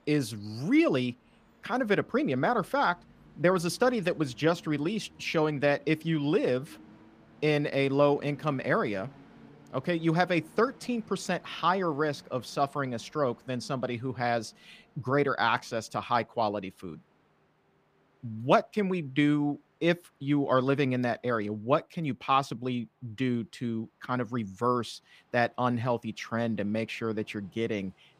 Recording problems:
train or aircraft noise; faint; throughout; 30 dB below the speech

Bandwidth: 15 kHz